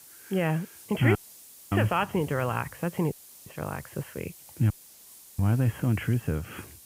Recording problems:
high frequencies cut off; severe; nothing above 3.5 kHz
hiss; noticeable; throughout; 20 dB below the speech
audio cutting out; at 1 s for 0.5 s, at 3 s and at 4.5 s for 0.5 s

